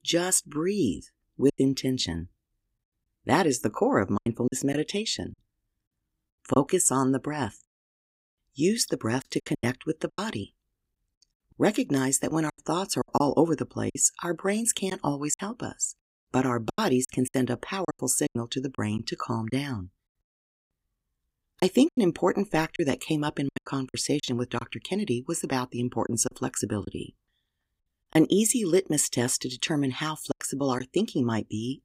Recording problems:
choppy; very; 8% of the speech affected

